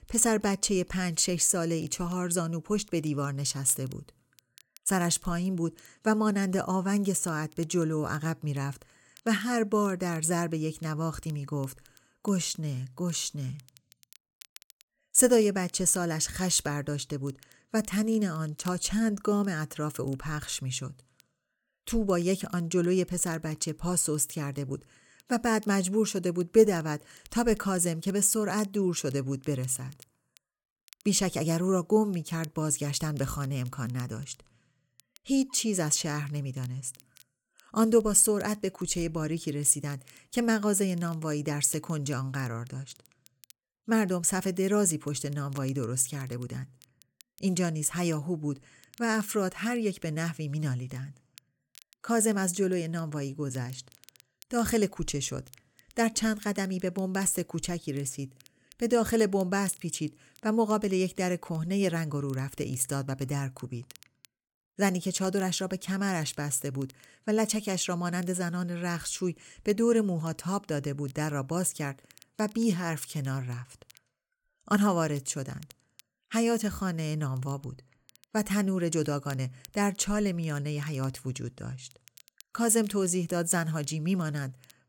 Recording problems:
crackle, like an old record; faint; 30 dB below the speech

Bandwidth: 17.5 kHz